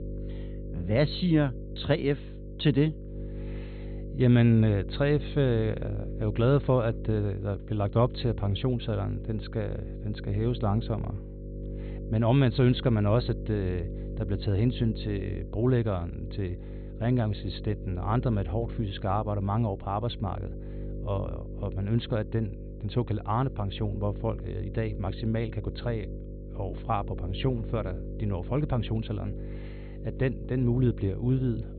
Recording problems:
high frequencies cut off; severe; nothing above 4 kHz
electrical hum; noticeable; throughout; 50 Hz, 15 dB below the speech

